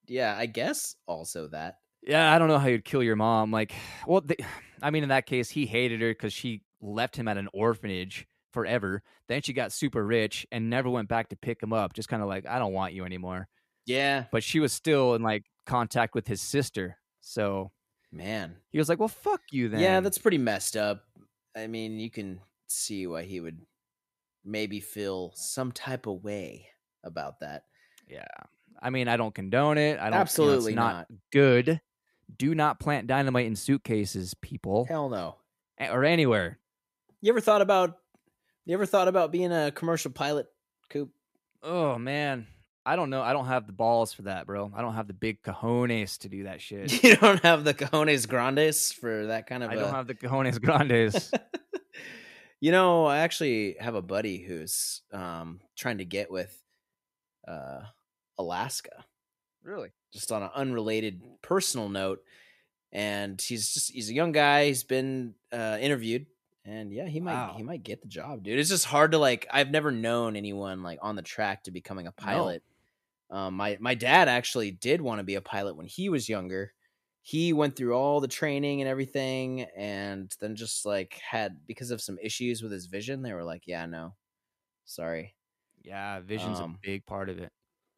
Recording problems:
none

